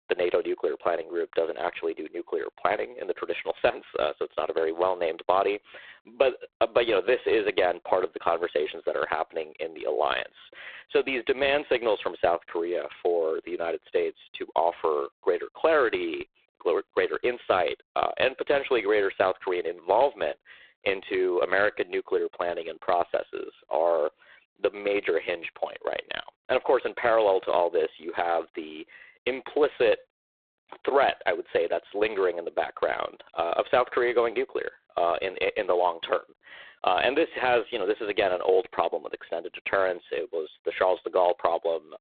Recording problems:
phone-call audio; poor line; nothing above 3.5 kHz

